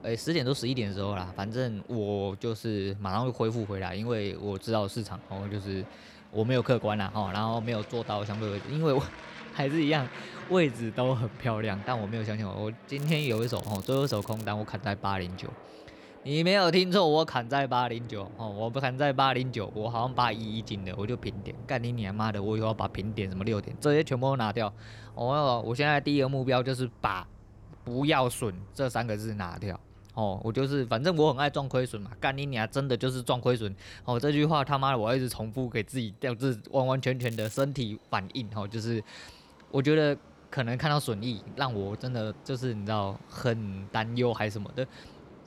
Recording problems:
train or aircraft noise; noticeable; throughout; 20 dB below the speech
crackling; noticeable; from 13 to 14 s and at 37 s; 20 dB below the speech

